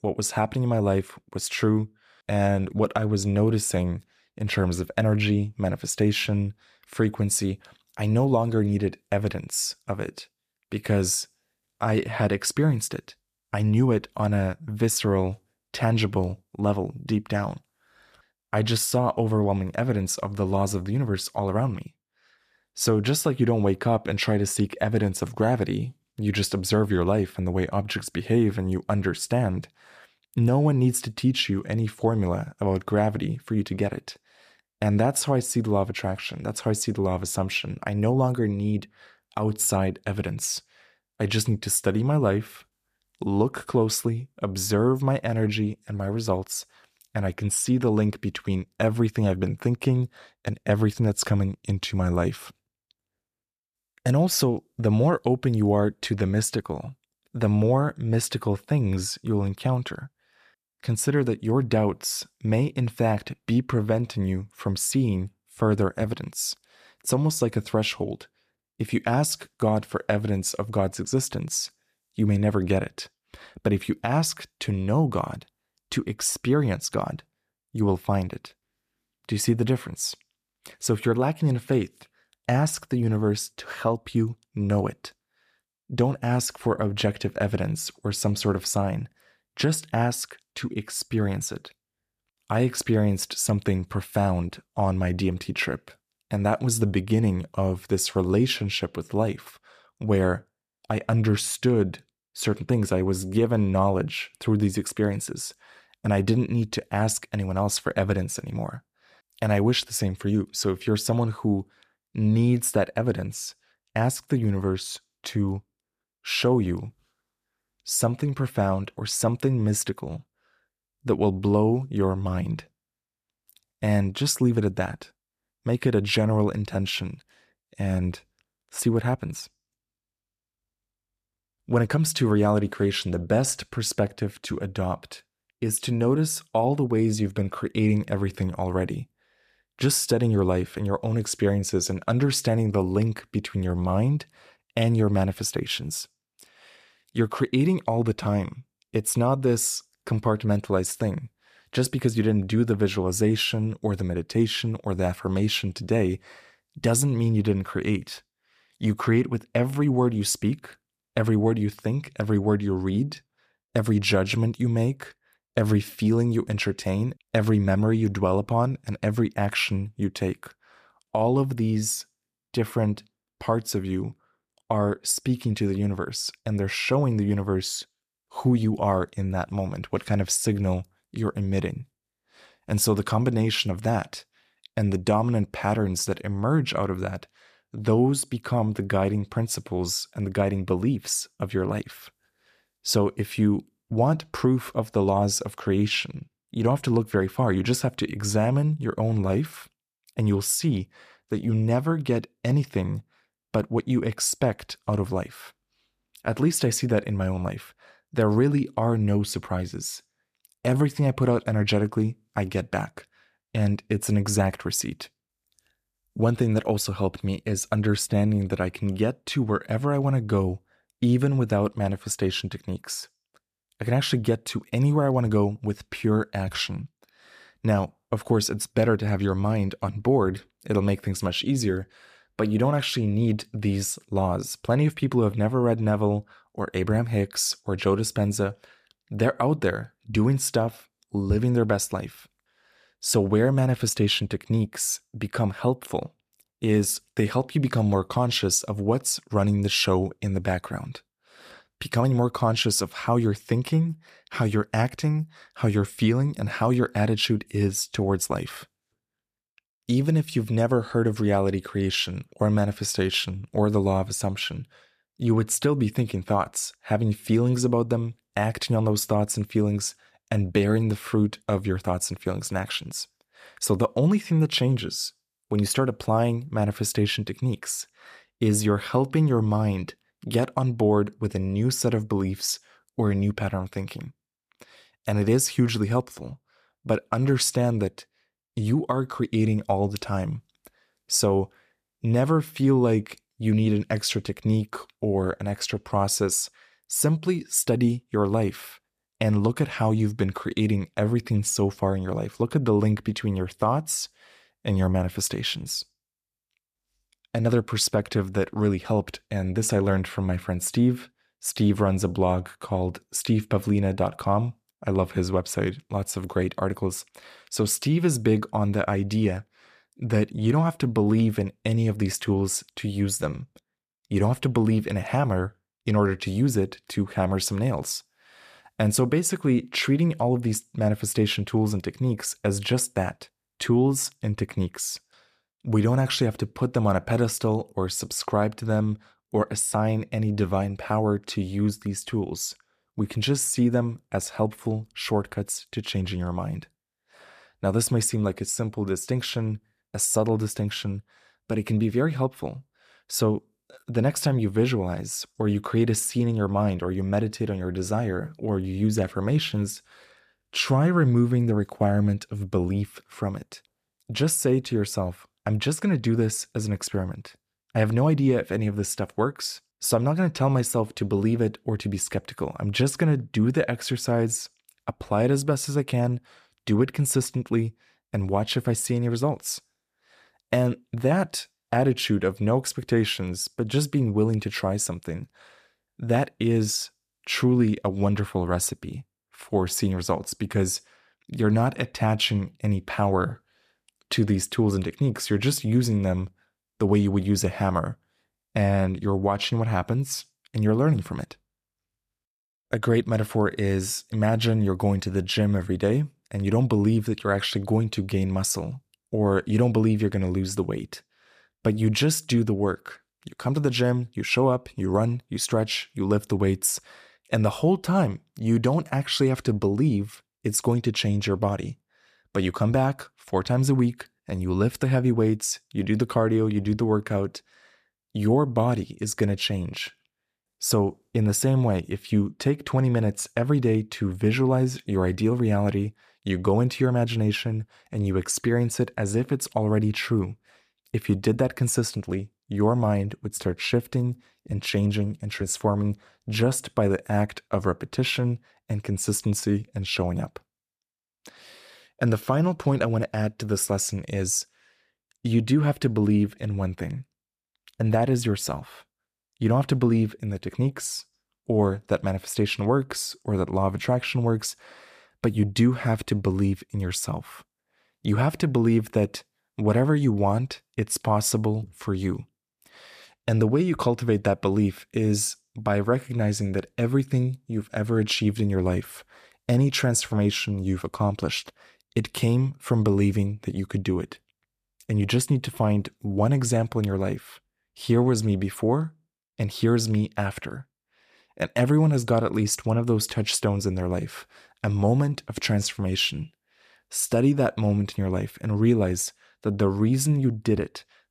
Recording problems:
none

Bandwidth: 14.5 kHz